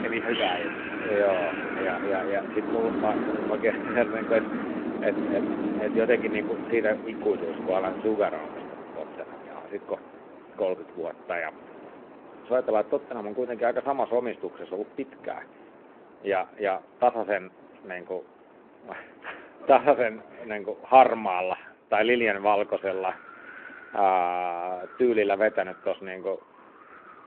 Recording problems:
phone-call audio
wind in the background; loud; throughout; 6 dB below the speech

